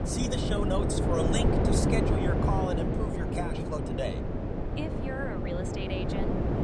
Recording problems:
wind noise on the microphone; heavy; 2 dB above the speech

